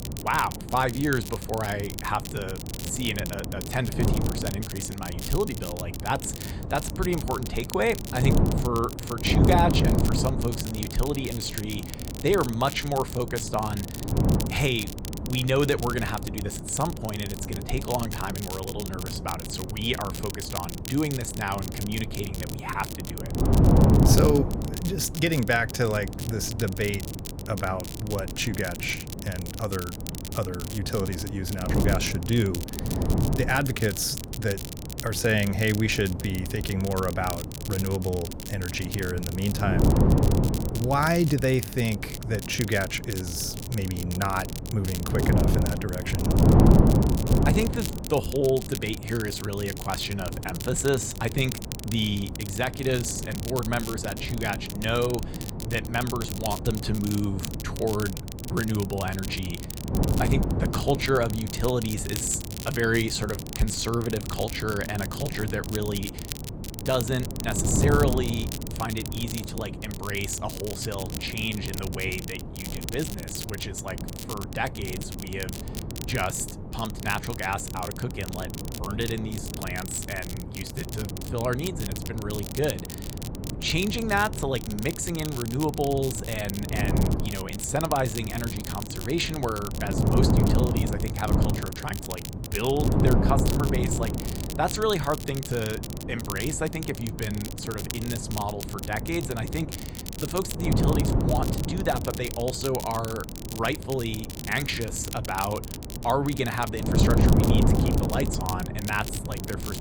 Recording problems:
wind noise on the microphone; heavy; 7 dB below the speech
crackle, like an old record; loud; 10 dB below the speech

